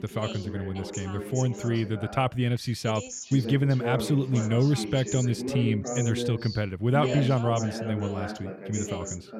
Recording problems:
background chatter; loud; throughout; 2 voices, 7 dB below the speech

